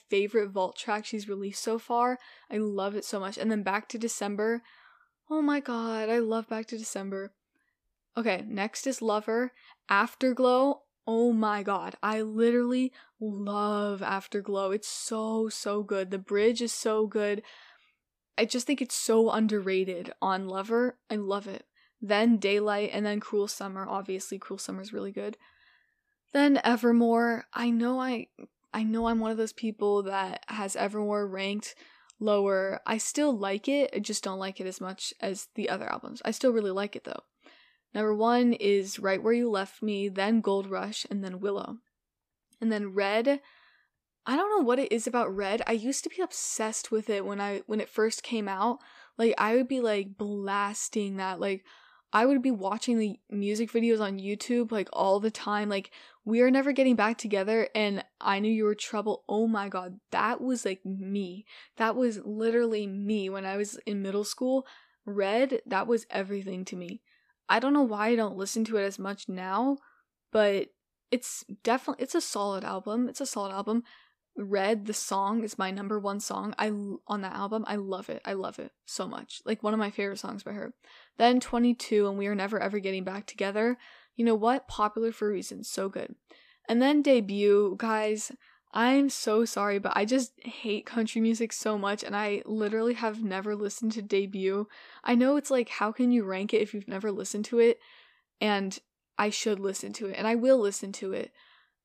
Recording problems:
none

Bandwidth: 14.5 kHz